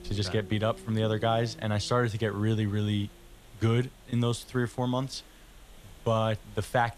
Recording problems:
hiss; faint; throughout; 25 dB below the speech
low rumble; faint; throughout; 20 dB below the speech

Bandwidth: 14 kHz